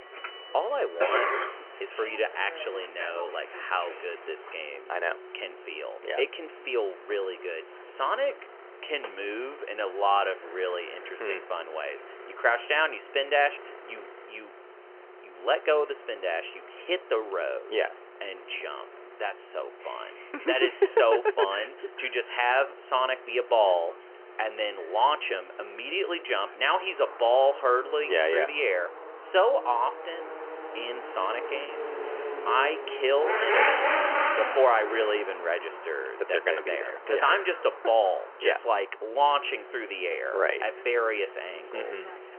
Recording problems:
phone-call audio; nothing above 3 kHz
traffic noise; loud; throughout; 7 dB below the speech
choppy; occasionally; at 32 s; 1% of the speech affected

